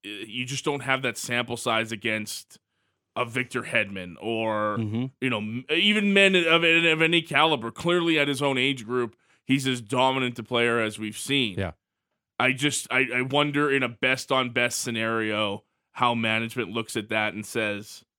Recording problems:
none

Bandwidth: 18.5 kHz